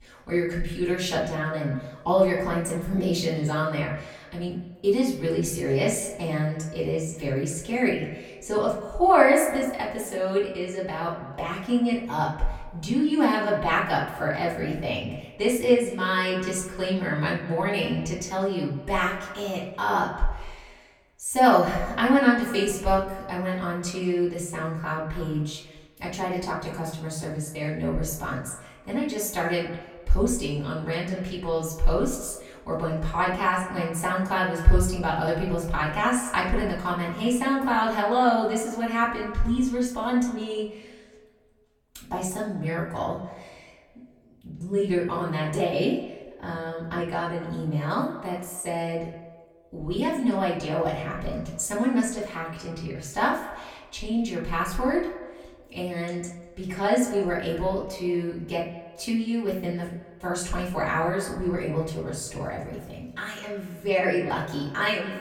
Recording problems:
off-mic speech; far
echo of what is said; noticeable; throughout; 190 ms later, 15 dB below the speech
room echo; slight; dies away in 0.5 s

